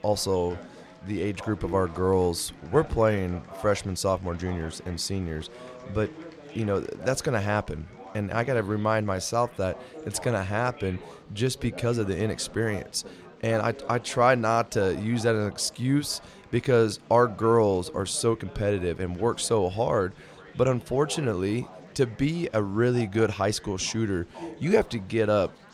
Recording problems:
chatter from many people; noticeable; throughout; 20 dB below the speech

